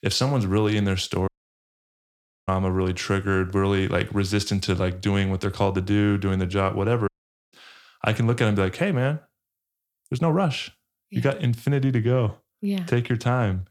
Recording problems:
audio cutting out; at 1.5 s for 1 s and at 7 s

